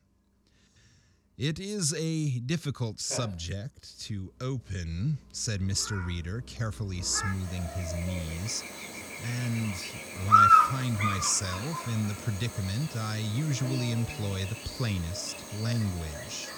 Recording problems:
animal sounds; very loud; throughout; 2 dB above the speech

